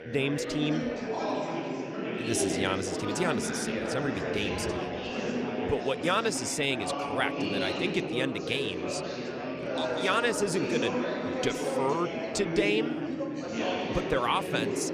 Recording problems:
chatter from many people; loud; throughout; 1 dB below the speech

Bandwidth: 14.5 kHz